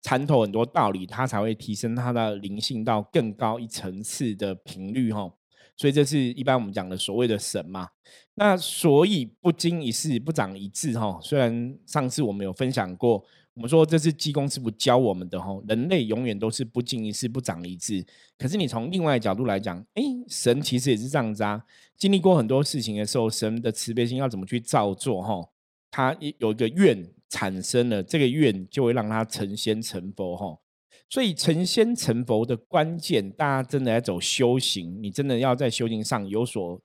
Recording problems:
none

